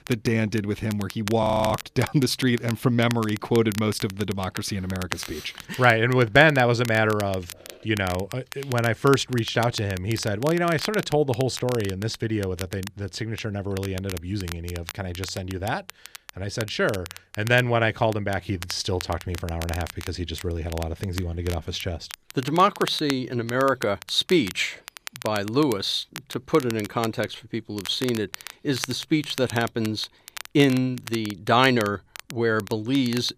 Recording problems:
crackle, like an old record; noticeable; 15 dB below the speech
audio freezing; at 1.5 s

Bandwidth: 14.5 kHz